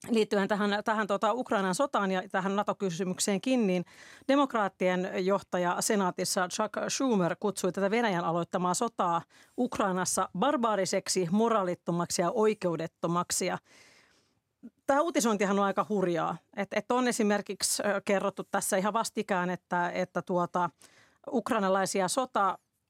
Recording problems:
none

